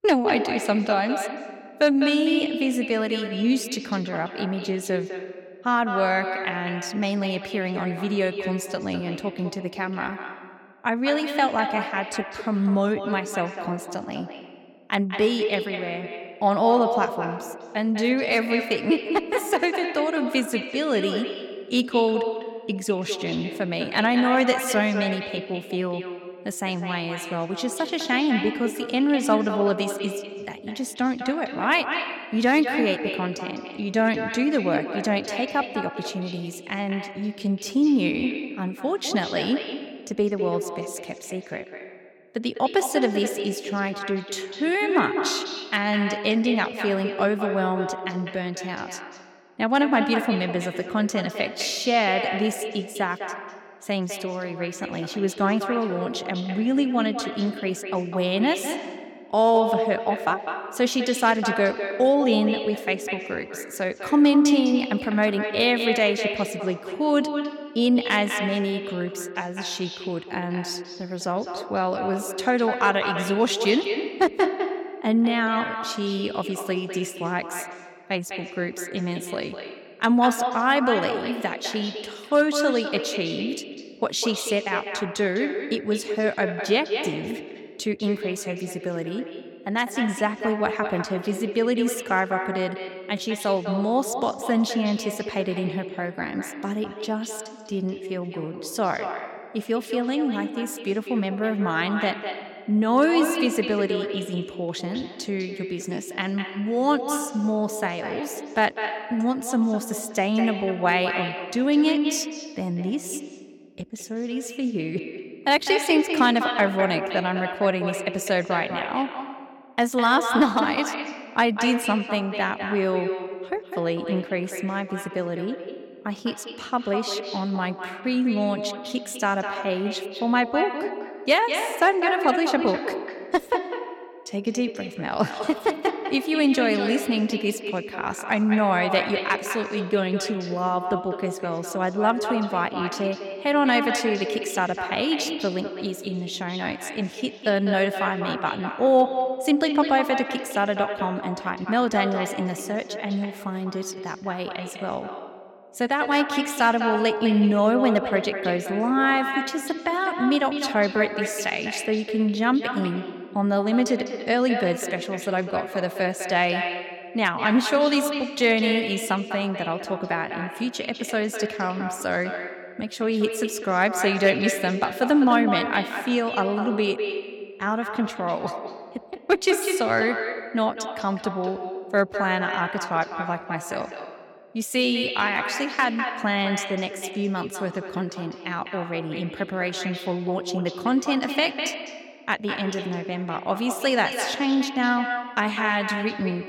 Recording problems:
echo of what is said; strong; throughout; 200 ms later, 6 dB below the speech

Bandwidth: 17 kHz